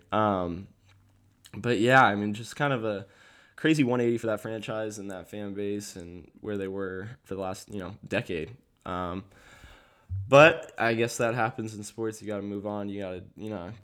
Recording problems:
uneven, jittery; strongly; from 3.5 to 11 s

